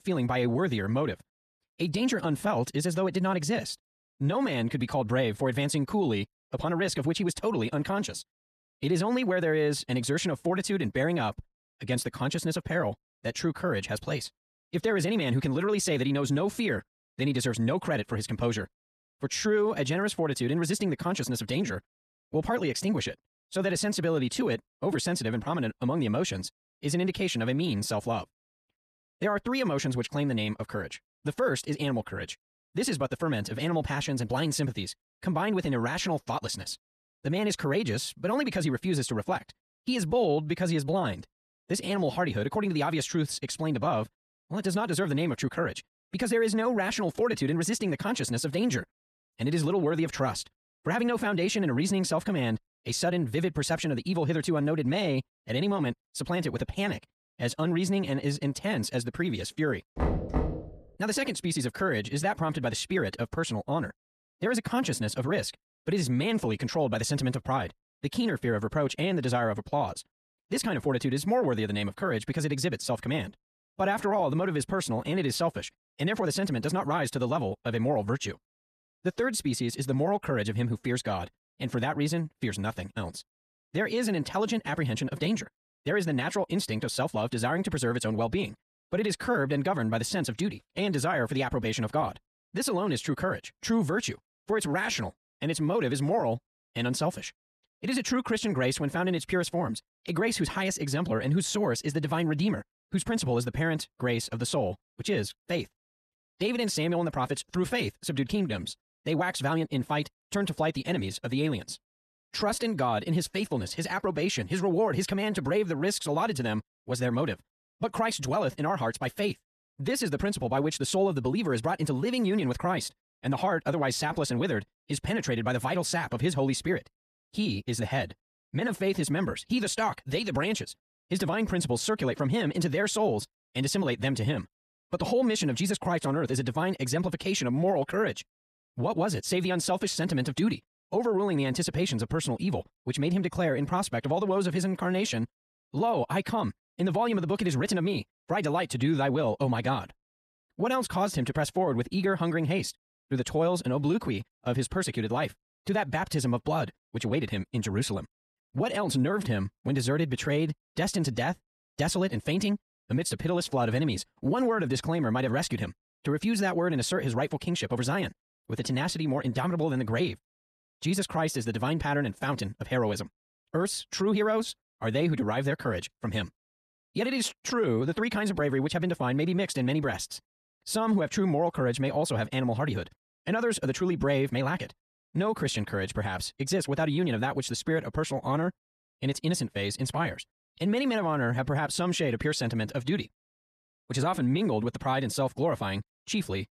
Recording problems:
wrong speed, natural pitch; too fast; 1.6 times normal speed
door banging; loud; at 1:00; peak level with the speech

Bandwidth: 13.5 kHz